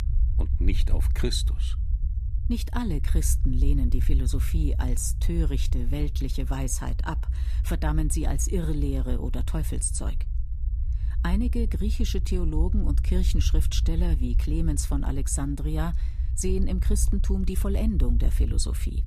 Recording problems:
low rumble; noticeable; throughout; 15 dB below the speech

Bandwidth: 14.5 kHz